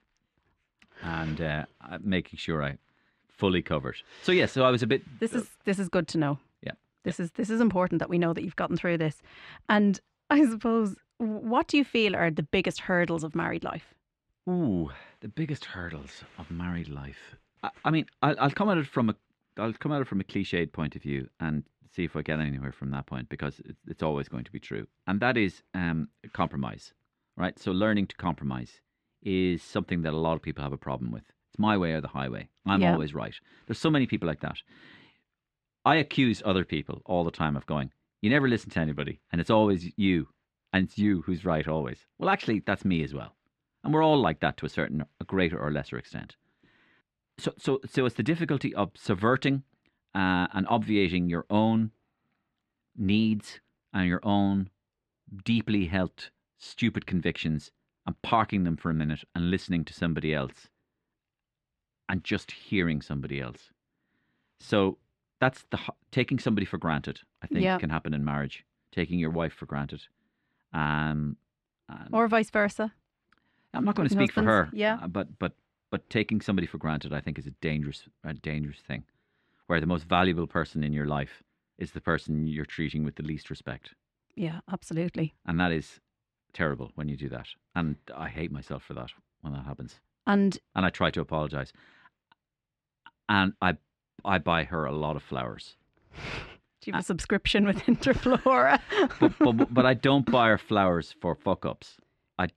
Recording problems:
muffled; slightly; fading above 3 kHz

